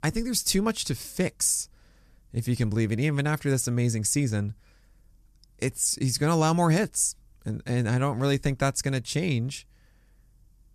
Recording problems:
none

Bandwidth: 14 kHz